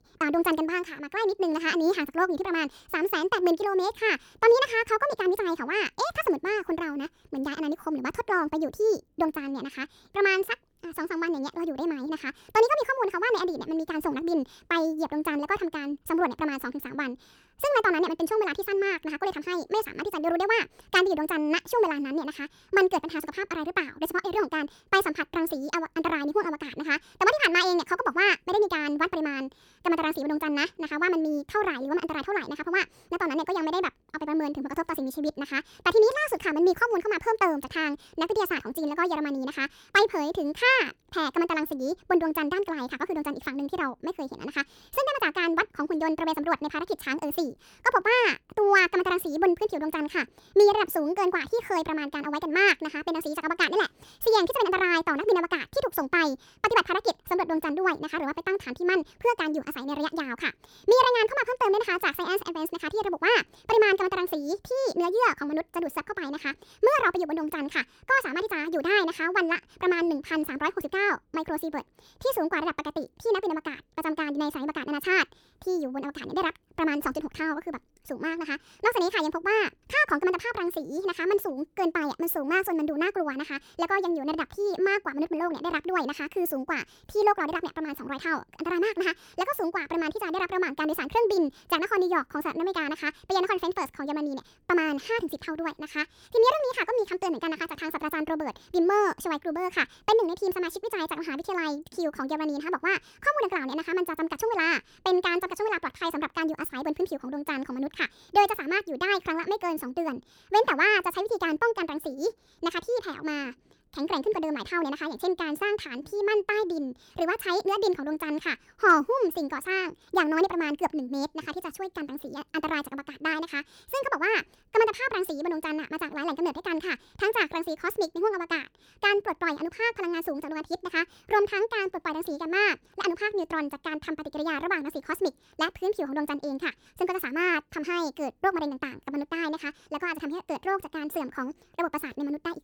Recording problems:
wrong speed and pitch; too fast and too high; 1.5 times normal speed

